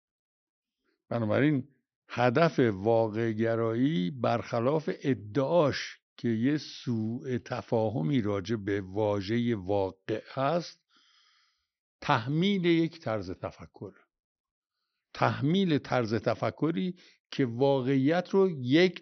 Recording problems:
high frequencies cut off; noticeable; nothing above 6 kHz

